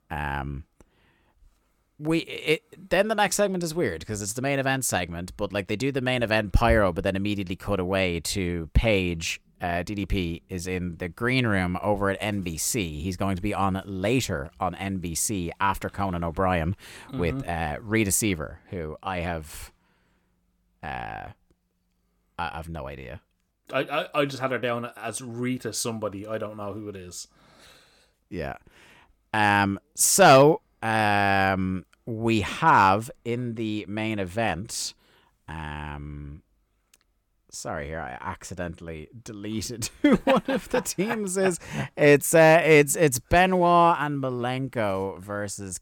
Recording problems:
none

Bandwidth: 17.5 kHz